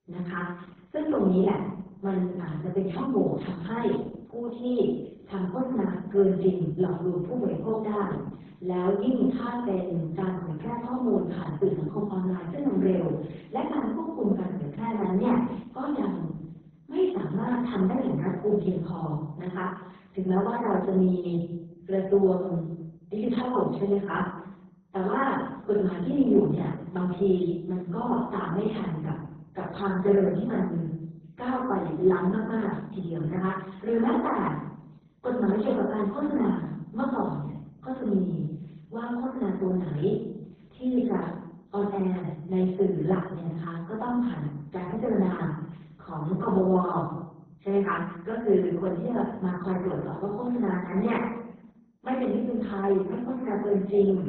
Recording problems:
off-mic speech; far
garbled, watery; badly
room echo; noticeable; dies away in 0.7 s

